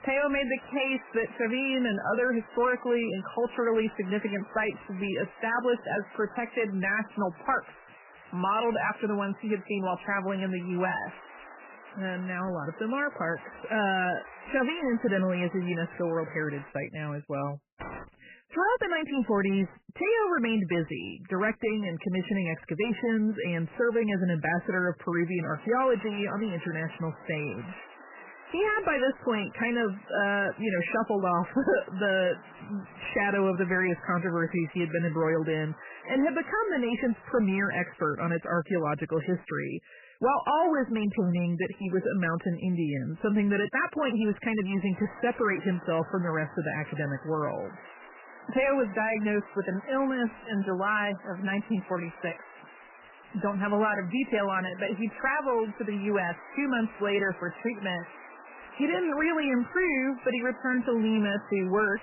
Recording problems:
garbled, watery; badly; nothing above 3 kHz
distortion; slight; 10 dB below the speech
hiss; noticeable; until 17 s, from 25 to 38 s and from 45 s on; 20 dB below the speech
jangling keys; faint; at 18 s; peak 10 dB below the speech

